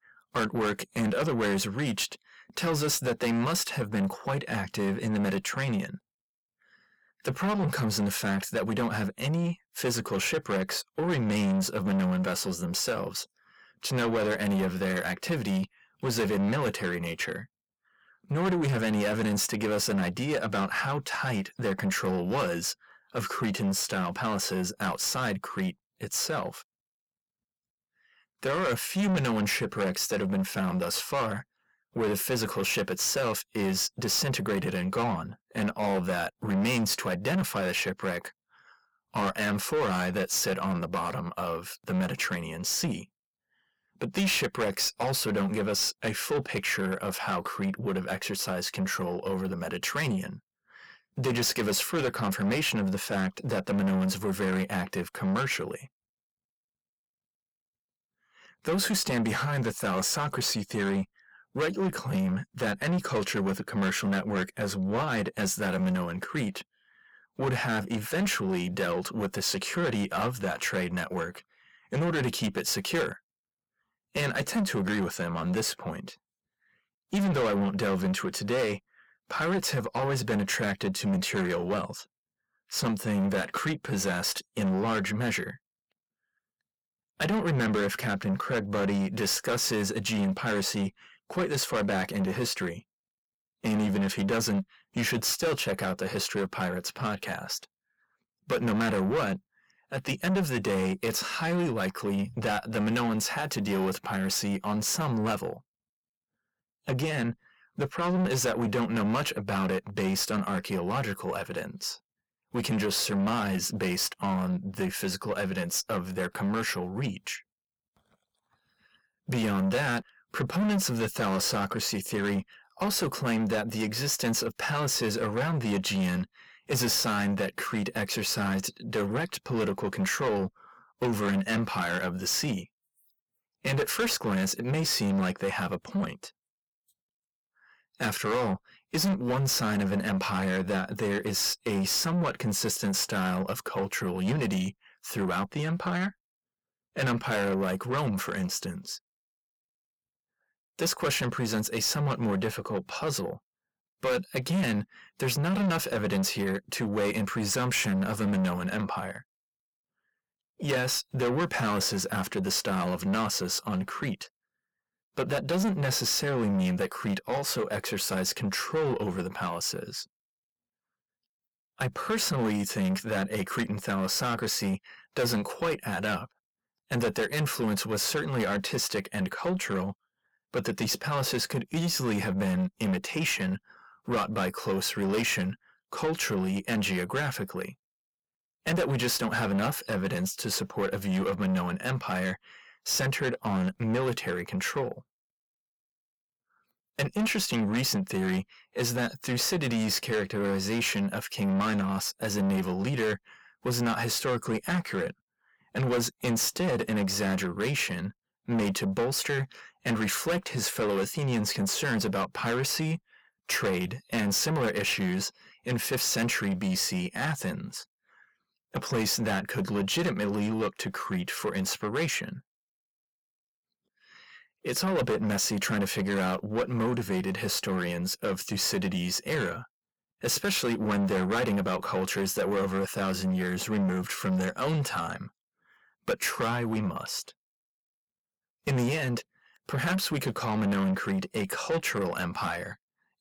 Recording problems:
distortion; heavy; 7 dB below the speech

